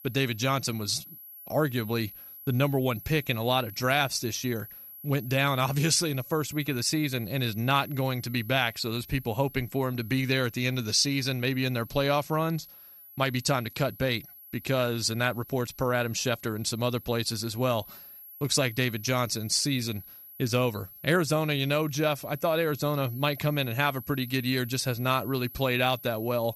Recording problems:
high-pitched whine; noticeable; throughout; 11.5 kHz, 15 dB below the speech

